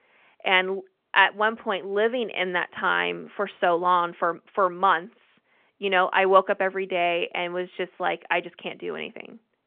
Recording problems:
phone-call audio; nothing above 3.5 kHz

